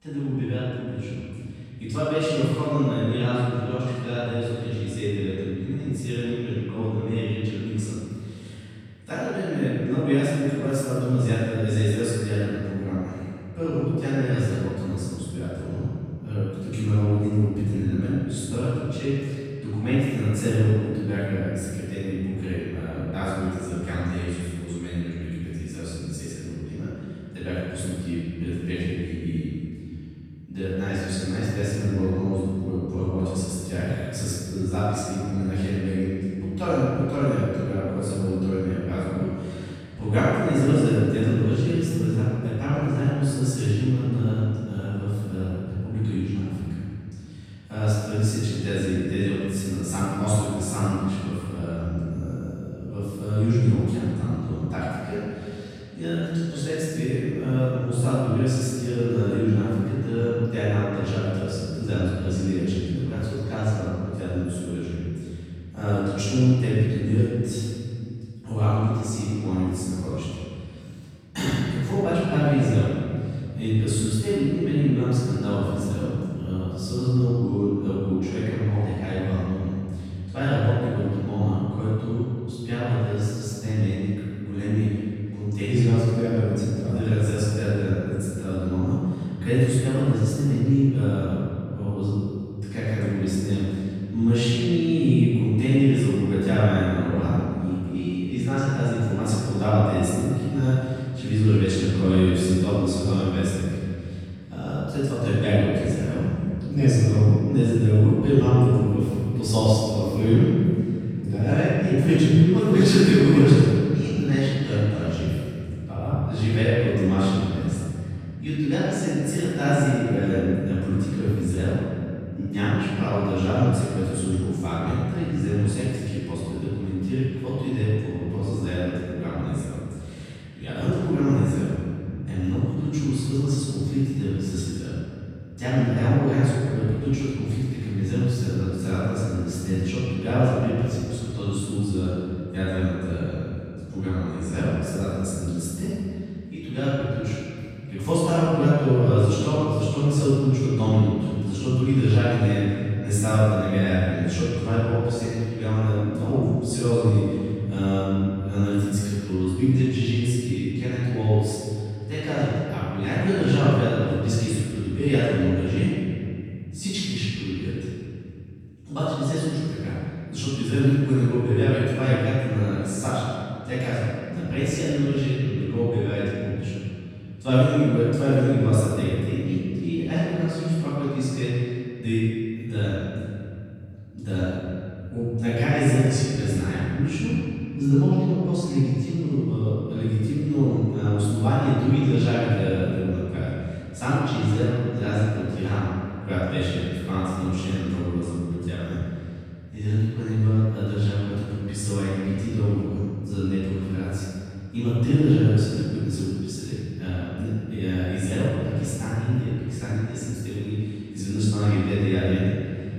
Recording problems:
room echo; strong; dies away in 2.3 s
off-mic speech; far

